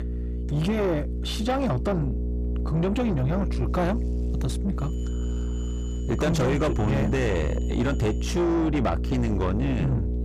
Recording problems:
distortion; heavy; 7 dB below the speech
electrical hum; loud; throughout; 60 Hz, 10 dB below the speech
high-pitched whine; faint; from 5 to 8.5 s; 7 kHz, 25 dB below the speech

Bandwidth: 15 kHz